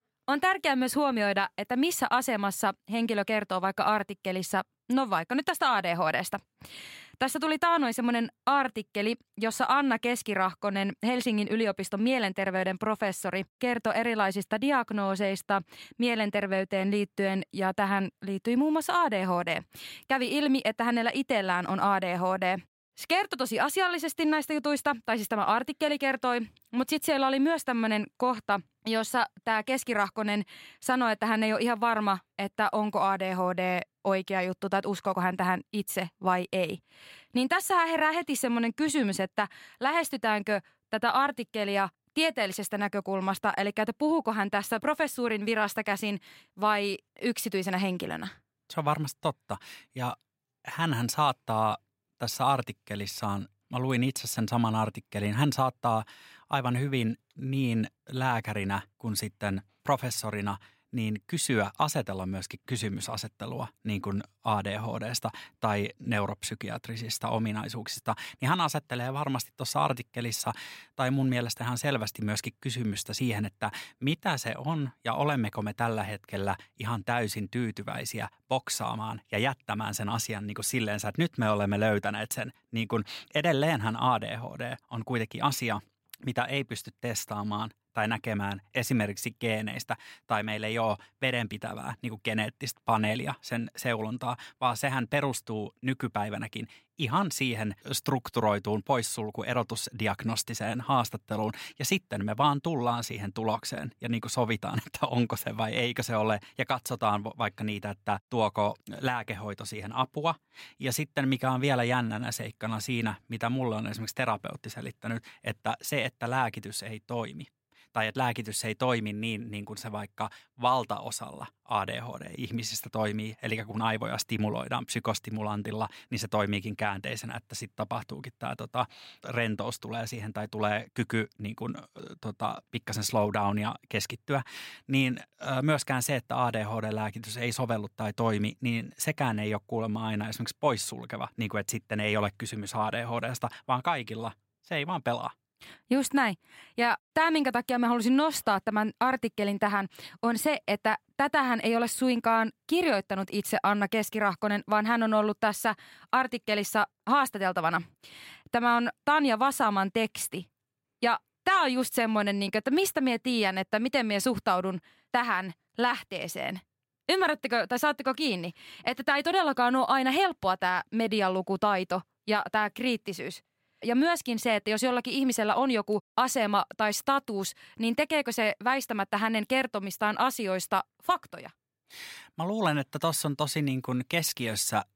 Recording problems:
none

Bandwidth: 16 kHz